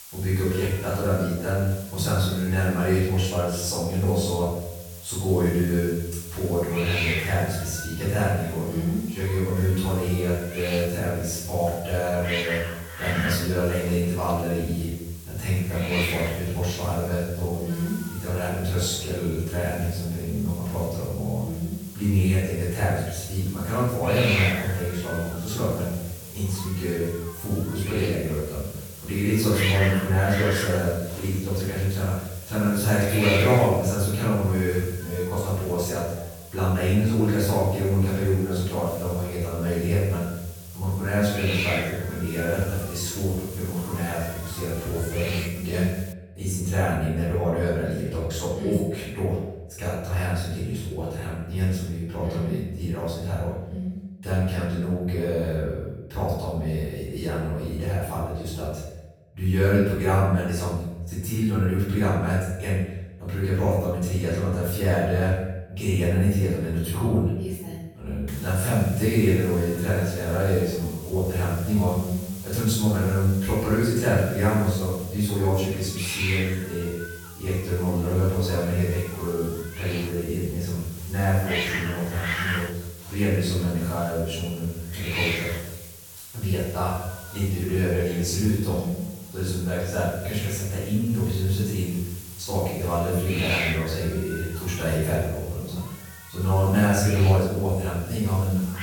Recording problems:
room echo; strong; dies away in 0.8 s
off-mic speech; far
hiss; very faint; until 46 s and from 1:08 on; 10 dB below the speech

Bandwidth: 17.5 kHz